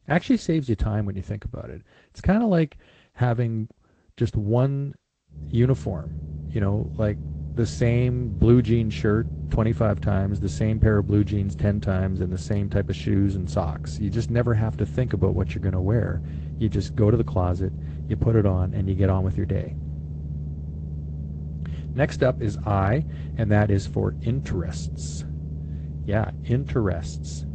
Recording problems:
garbled, watery; slightly; nothing above 8 kHz
low rumble; noticeable; from 5.5 s on; 15 dB below the speech

